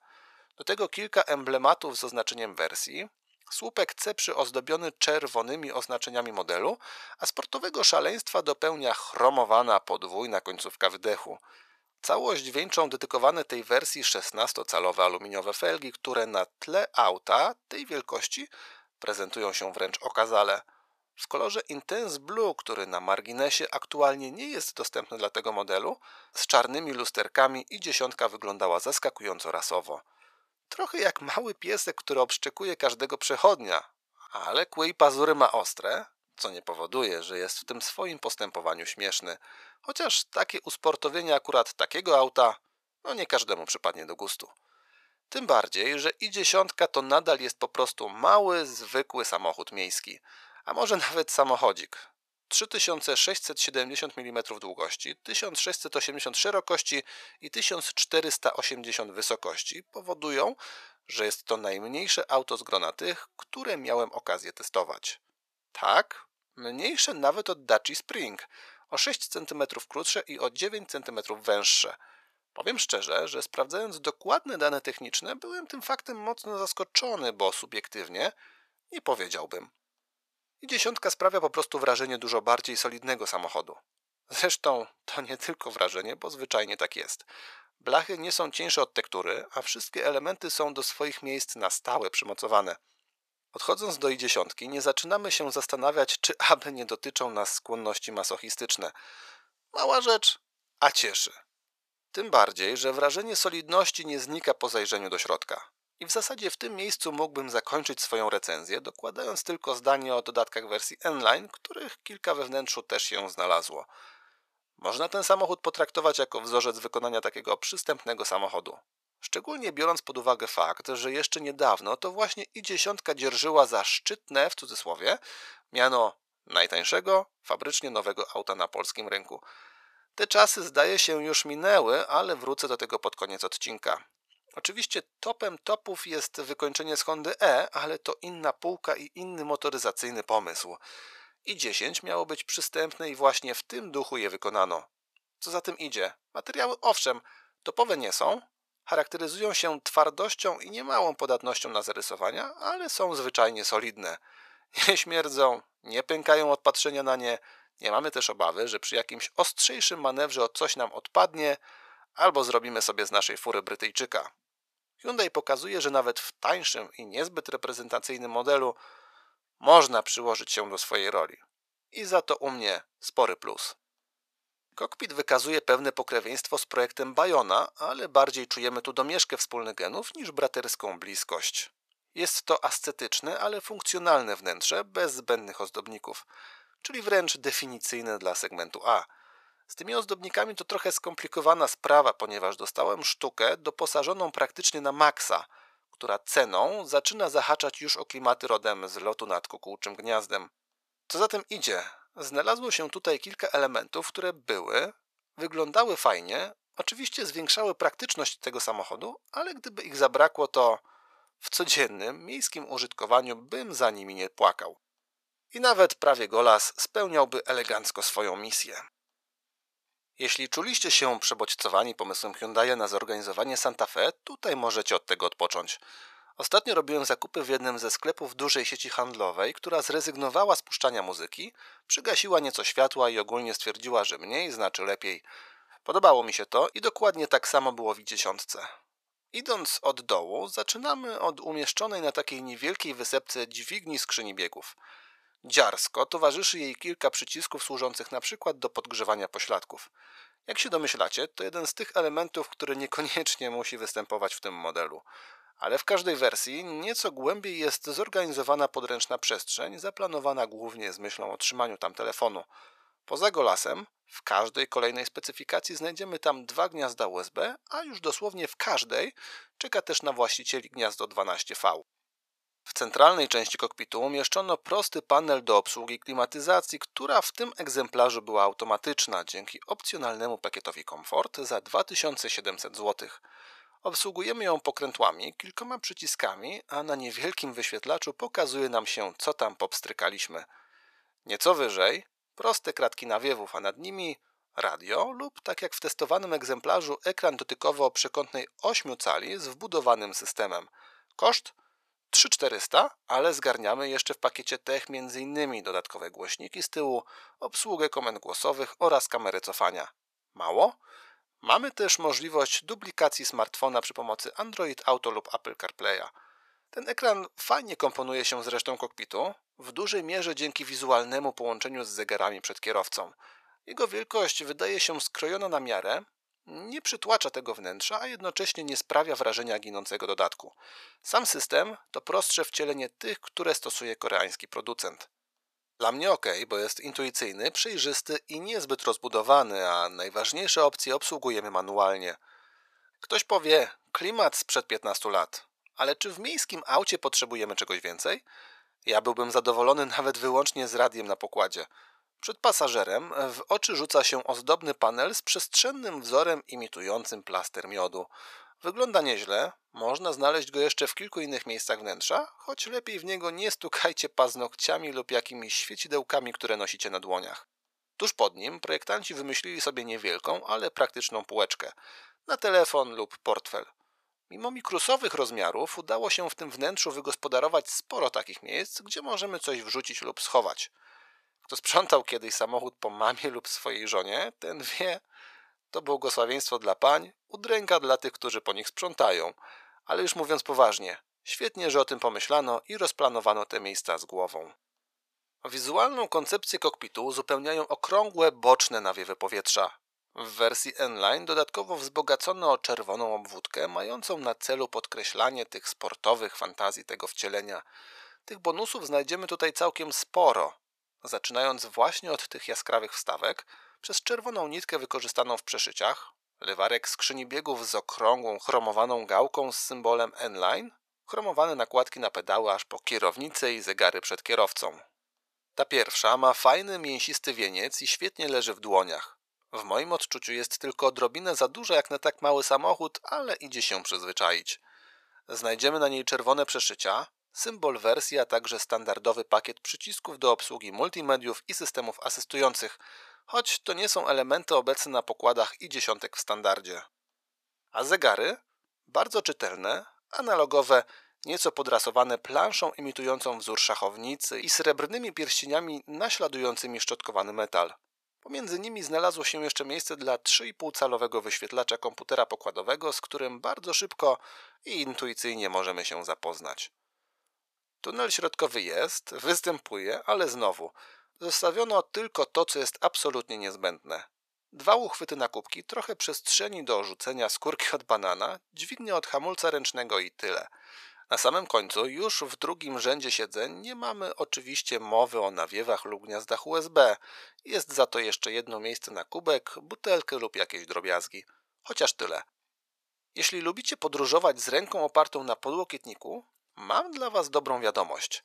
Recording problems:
thin; very; fading below 750 Hz

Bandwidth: 14.5 kHz